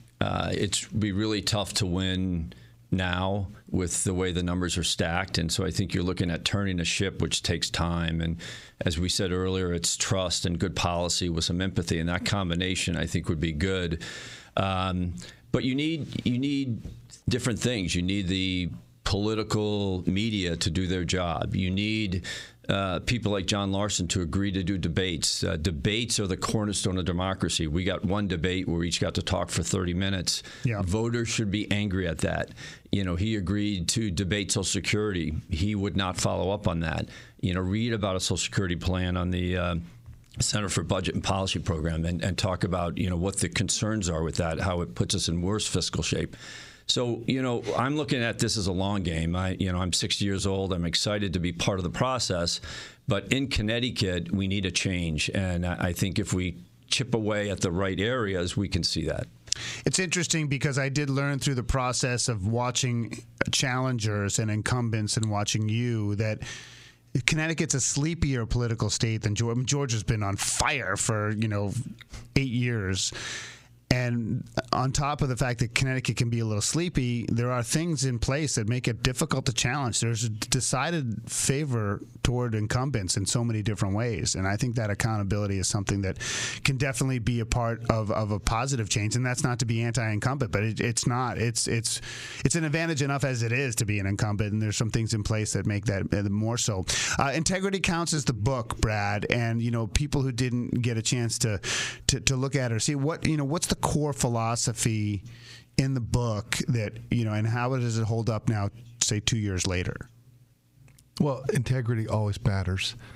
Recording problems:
squashed, flat; heavily

